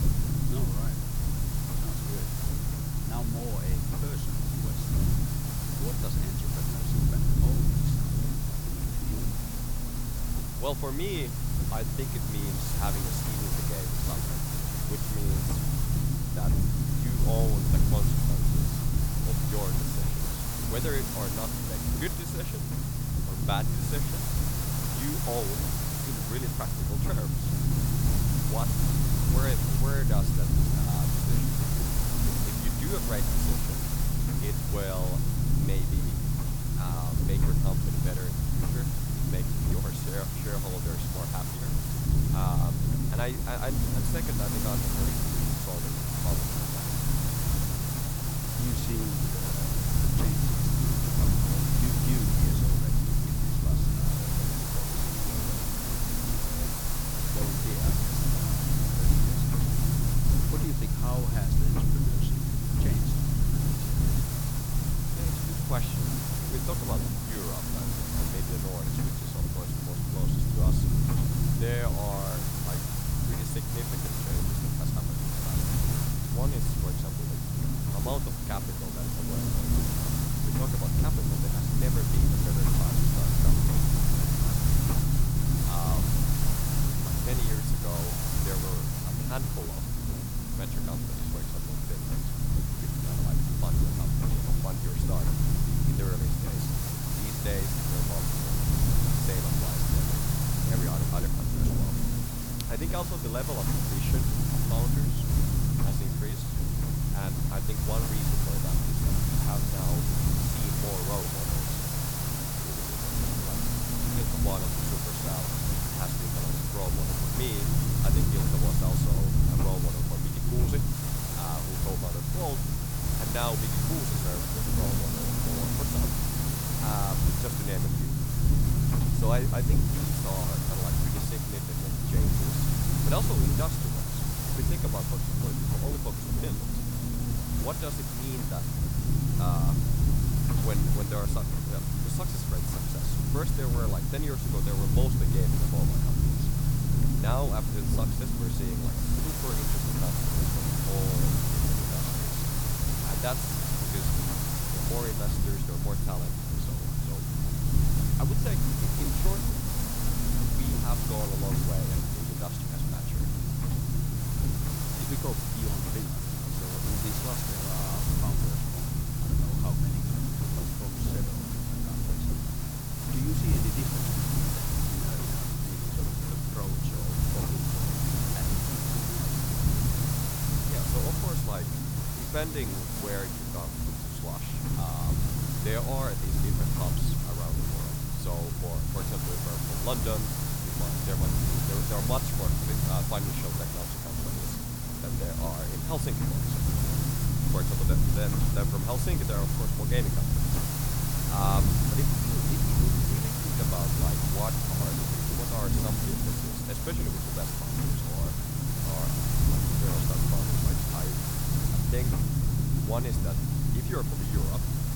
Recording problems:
hiss; very loud; throughout; 6 dB above the speech
low rumble; loud; throughout; as loud as the speech

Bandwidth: 18.5 kHz